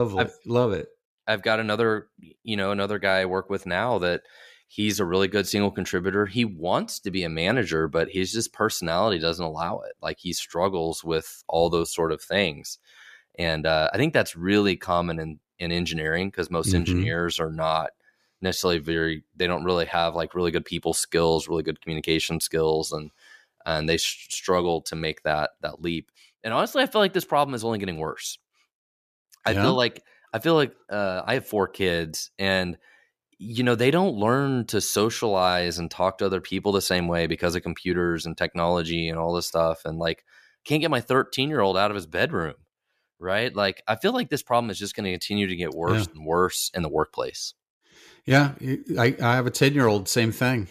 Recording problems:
abrupt cut into speech; at the start

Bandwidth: 14.5 kHz